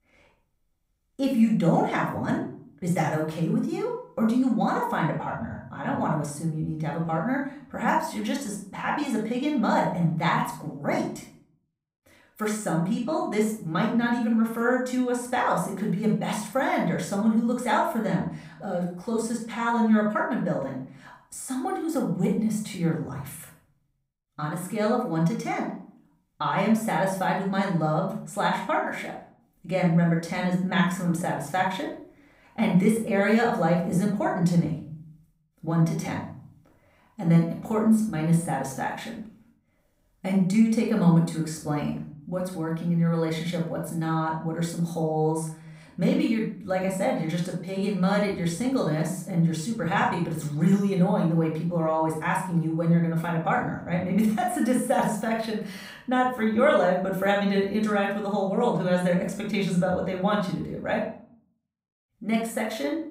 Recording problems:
off-mic speech; far
room echo; noticeable; dies away in 0.5 s

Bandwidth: 15.5 kHz